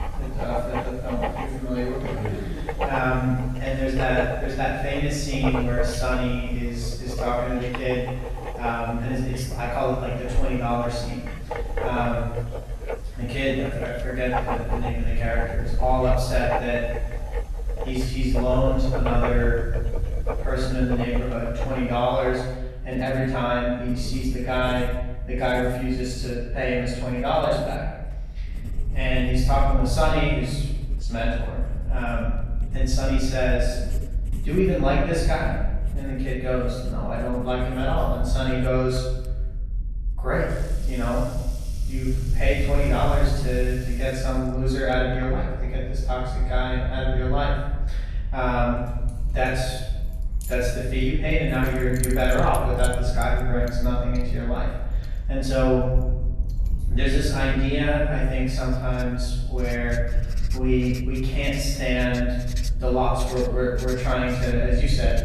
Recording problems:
room echo; strong; dies away in 1 s
off-mic speech; far
household noises; noticeable; throughout; 10 dB below the speech
low rumble; faint; throughout; 25 dB below the speech

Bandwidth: 13.5 kHz